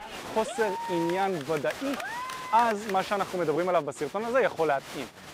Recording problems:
crowd noise; loud; throughout; 10 dB below the speech

